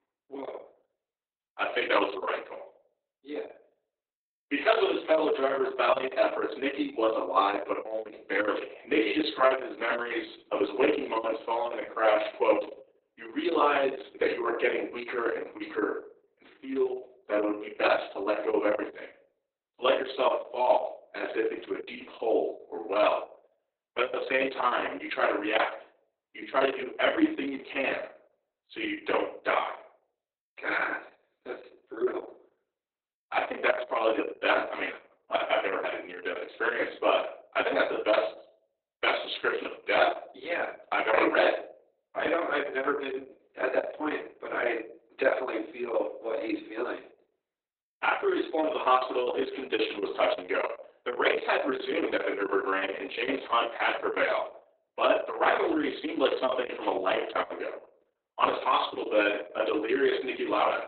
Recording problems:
off-mic speech; far
garbled, watery; badly; nothing above 4 kHz
thin; somewhat; fading below 300 Hz
room echo; slight; dies away in 0.4 s

